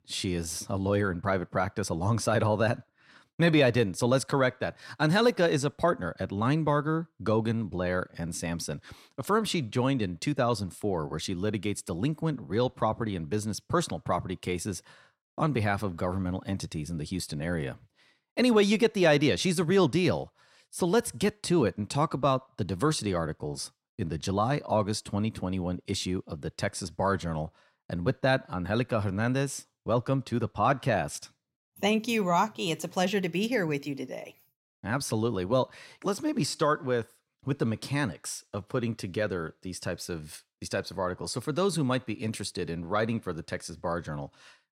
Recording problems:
none

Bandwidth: 16 kHz